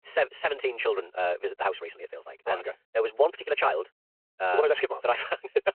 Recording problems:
wrong speed, natural pitch; too fast; 1.7 times normal speed
phone-call audio

